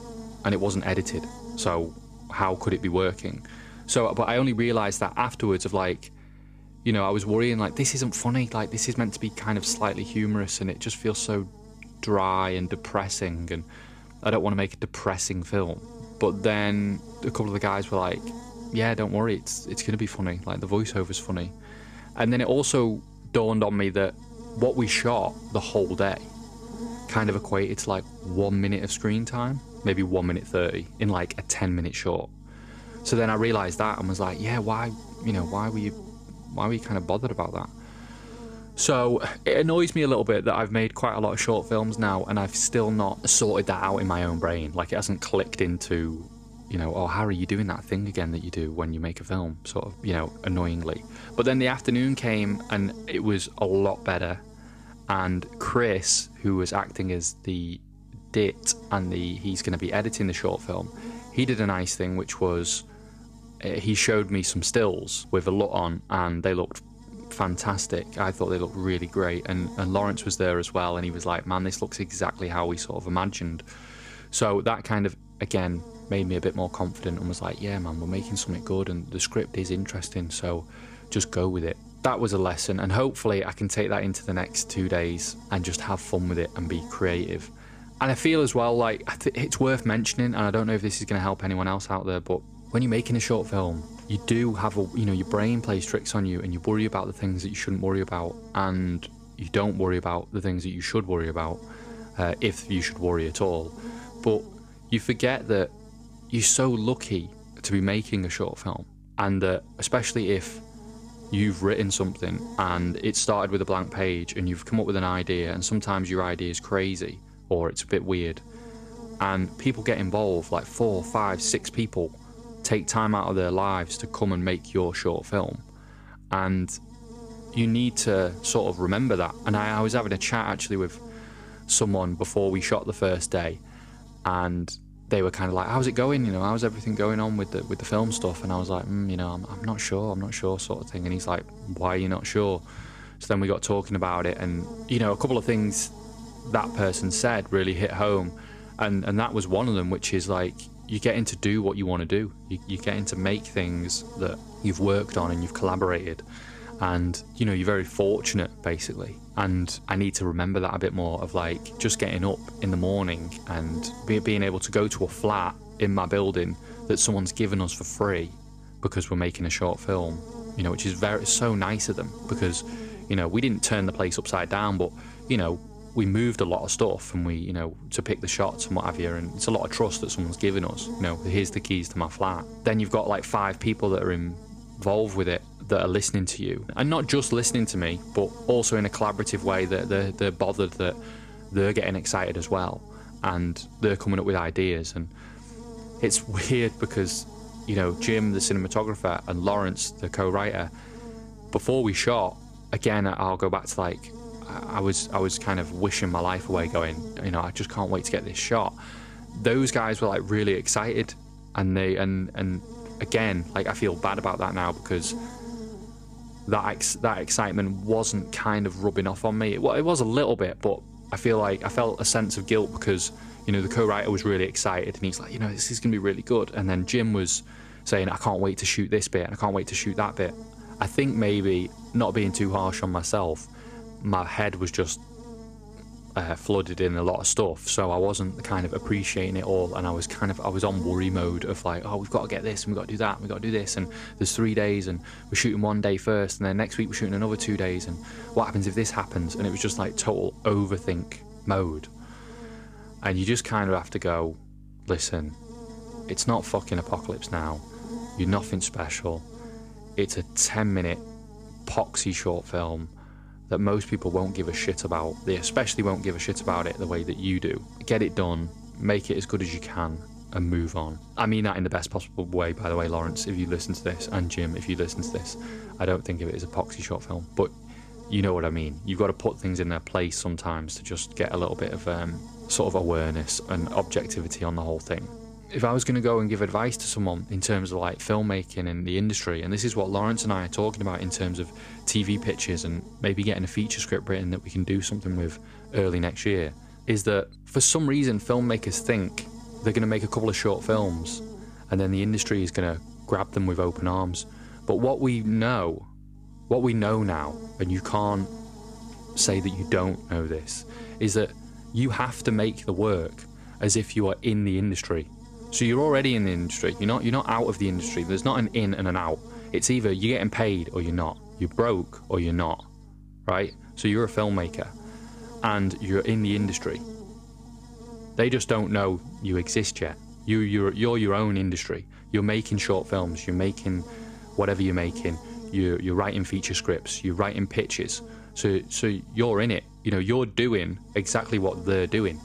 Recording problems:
electrical hum; noticeable; throughout; 50 Hz, 20 dB below the speech

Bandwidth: 14.5 kHz